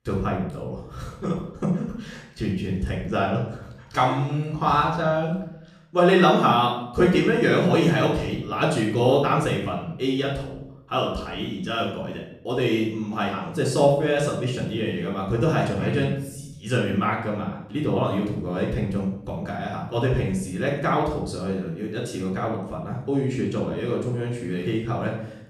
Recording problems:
off-mic speech; far
room echo; noticeable; dies away in 0.6 s

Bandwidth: 15 kHz